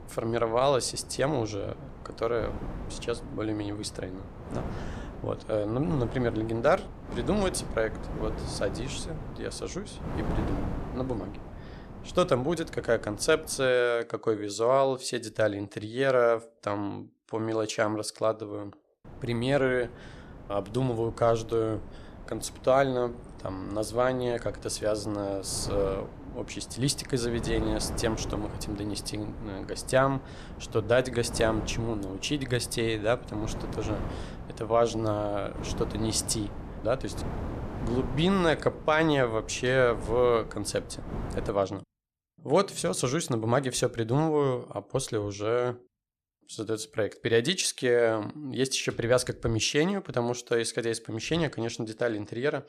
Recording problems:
wind noise on the microphone; occasional gusts; until 14 s and from 19 to 41 s; 15 dB below the speech

